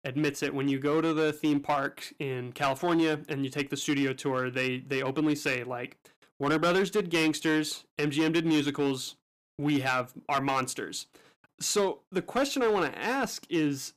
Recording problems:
distortion; slight; 6% of the sound clipped

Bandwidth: 14.5 kHz